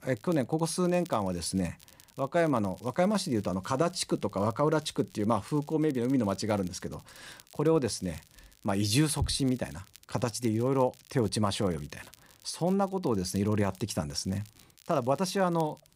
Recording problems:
crackle, like an old record; faint; 25 dB below the speech

